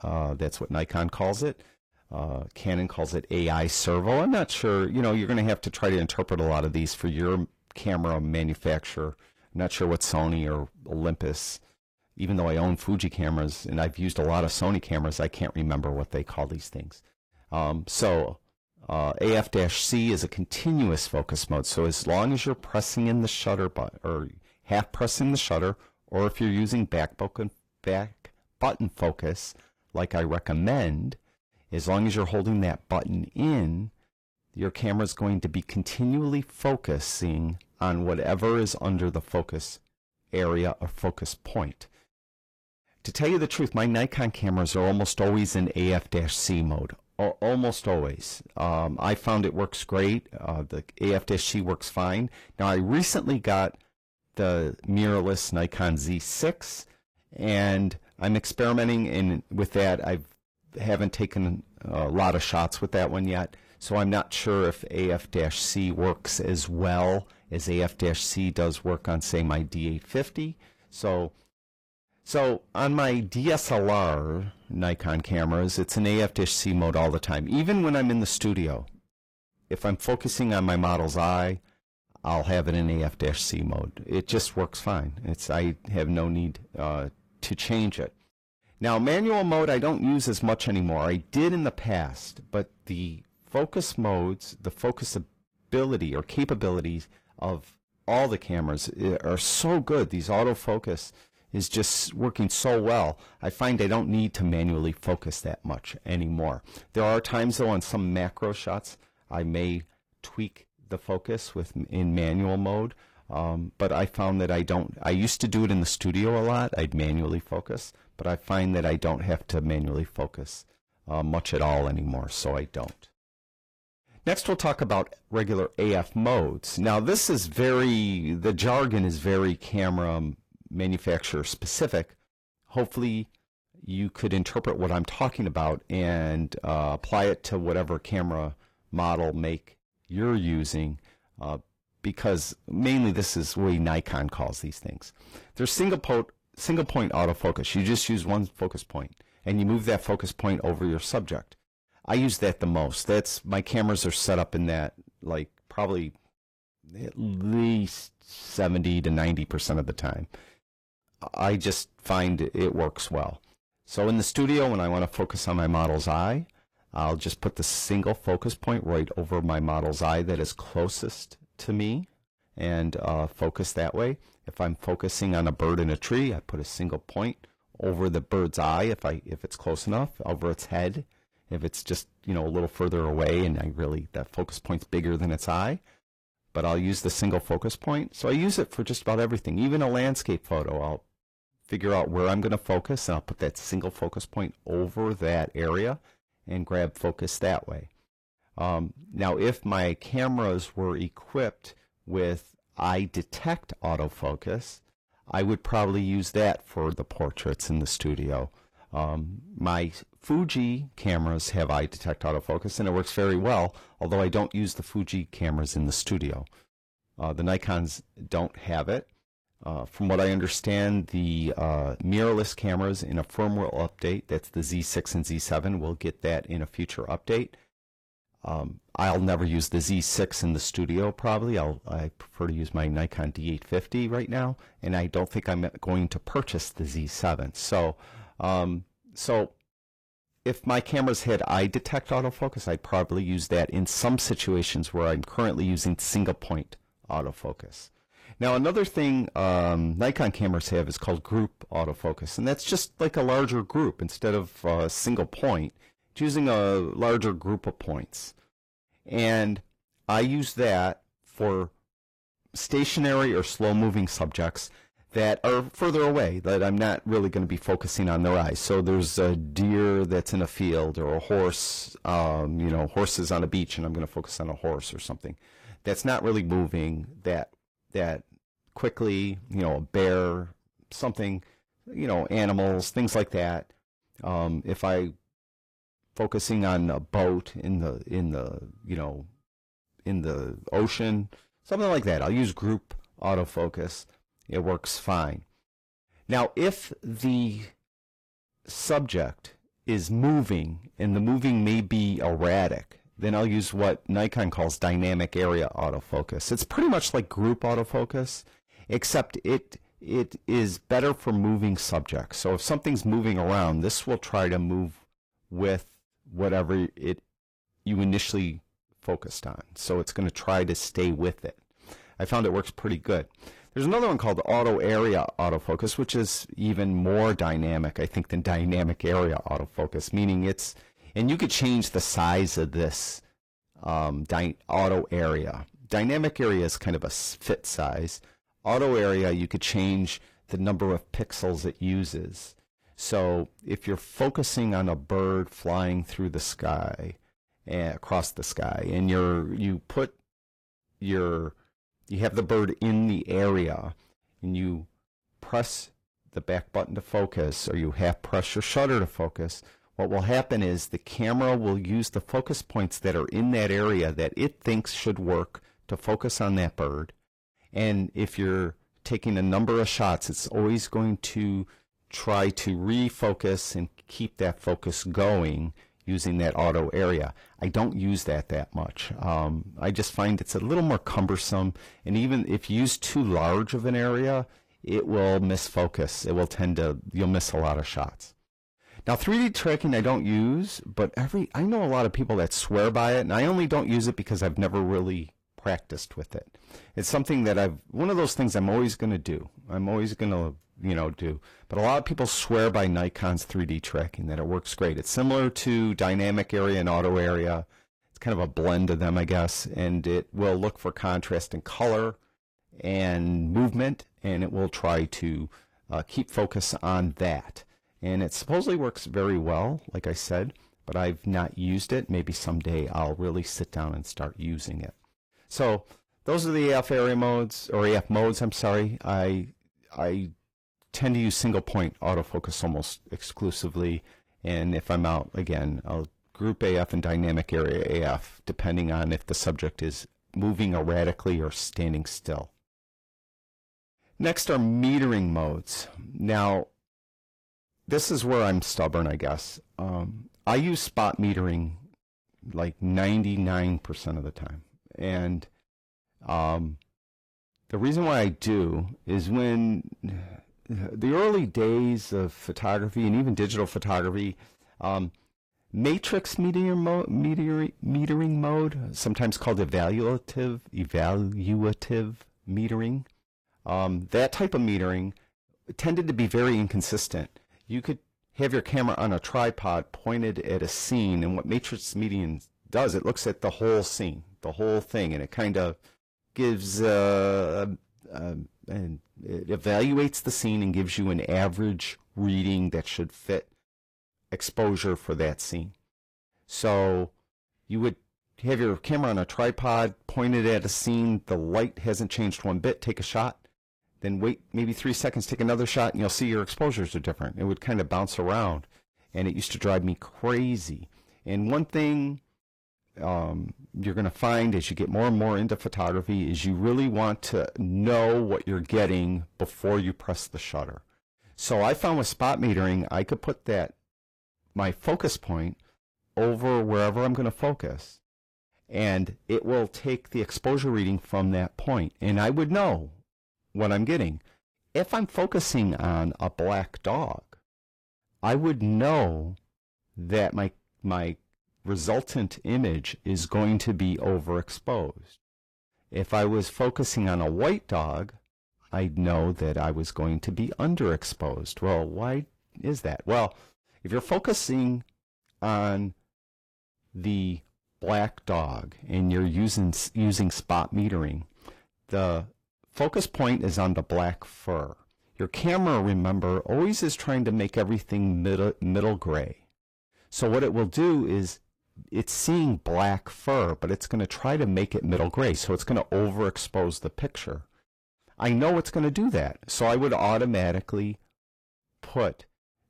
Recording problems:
distortion; slight; 10 dB below the speech
garbled, watery; slightly; nothing above 15 kHz

